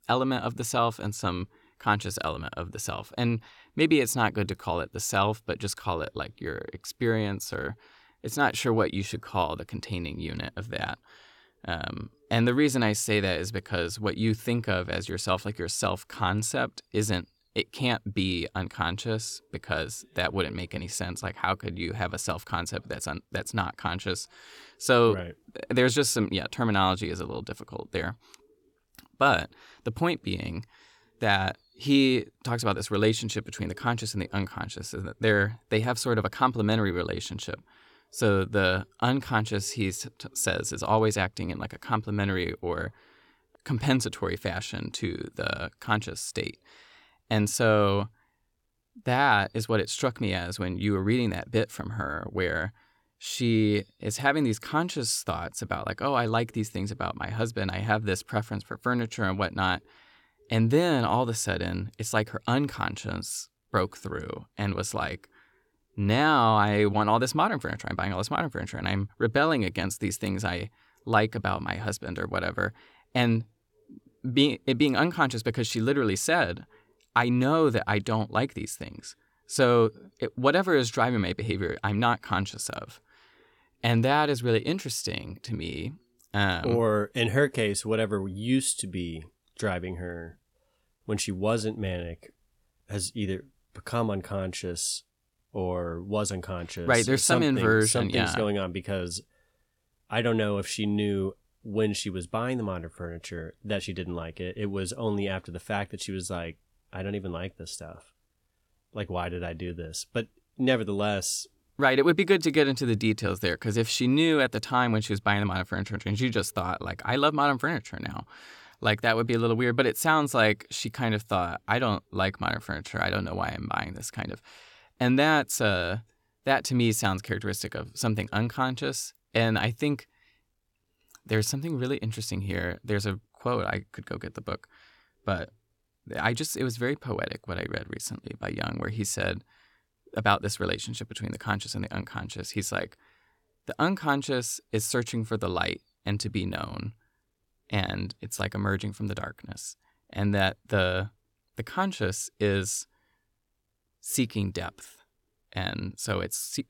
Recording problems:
none

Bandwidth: 17 kHz